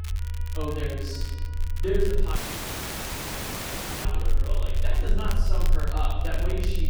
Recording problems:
off-mic speech; far
room echo; noticeable; dies away in 1.2 s
low rumble; noticeable; throughout; 15 dB below the speech
crackle, like an old record; noticeable; 10 dB below the speech
background music; faint; throughout; 20 dB below the speech
audio cutting out; at 2.5 s for 1.5 s

